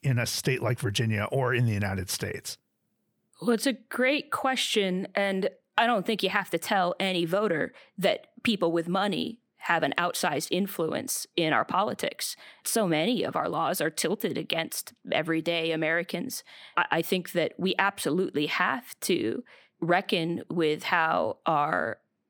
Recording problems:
none

